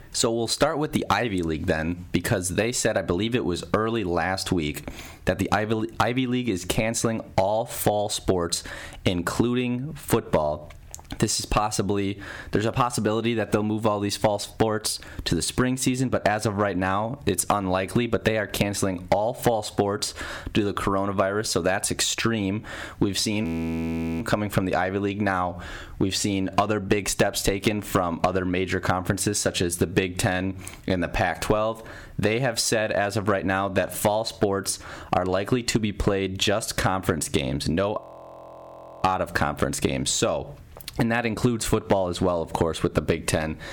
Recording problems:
distortion; slight; 0.9% of the sound clipped
squashed, flat; somewhat
audio freezing; at 23 s for 1 s and at 38 s for 1 s

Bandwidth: 18.5 kHz